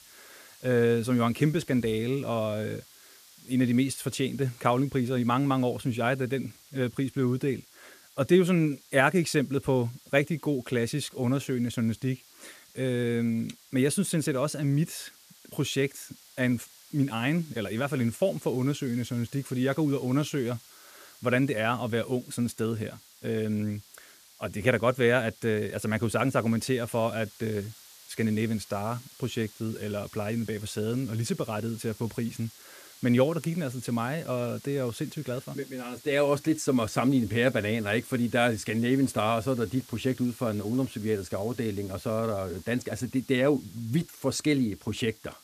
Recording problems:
hiss; faint; throughout; 20 dB below the speech

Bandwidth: 14.5 kHz